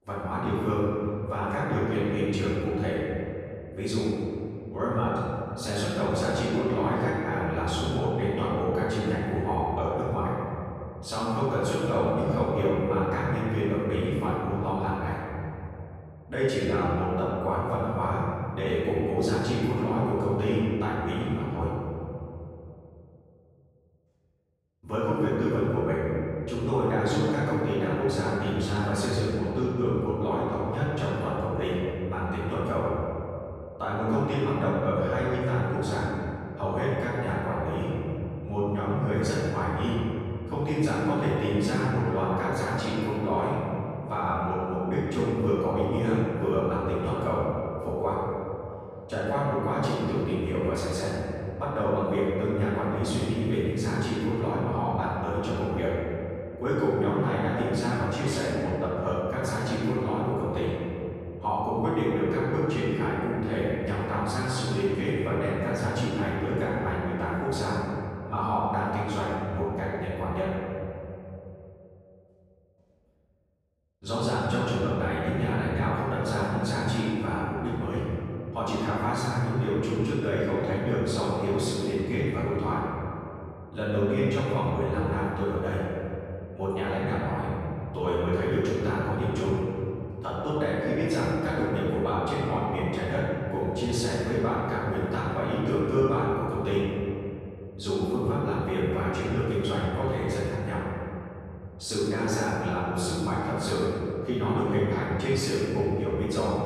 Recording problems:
room echo; strong; dies away in 2.9 s
off-mic speech; far

